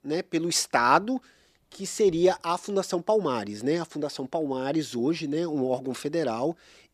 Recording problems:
none

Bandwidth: 14.5 kHz